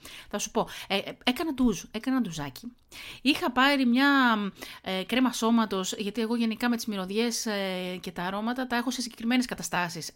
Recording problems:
none

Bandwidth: 16 kHz